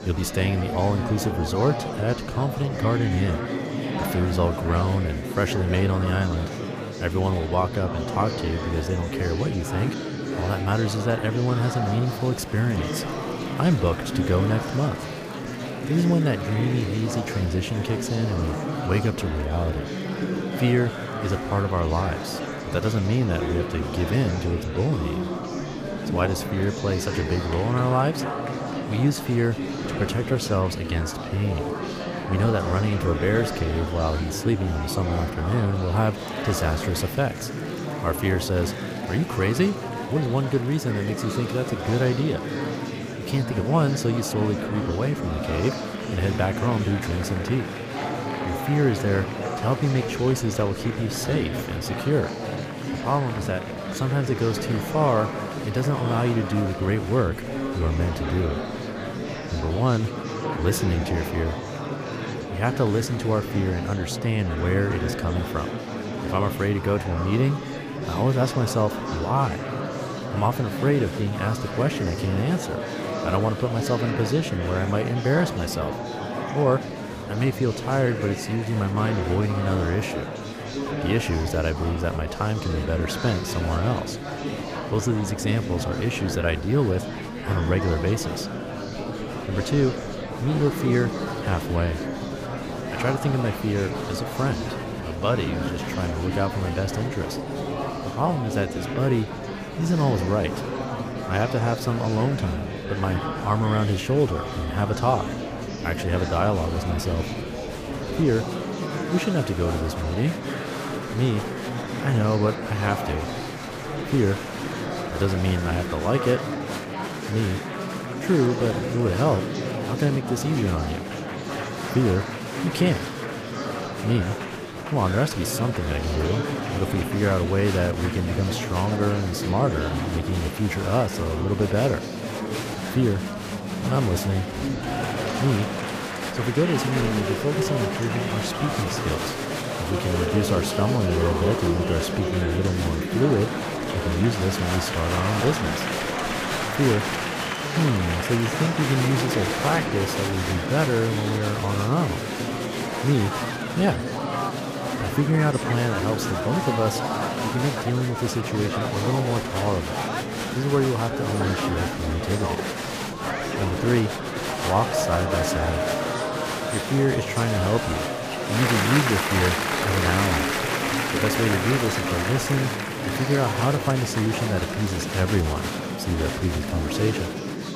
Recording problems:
murmuring crowd; loud; throughout; 3 dB below the speech

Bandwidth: 15 kHz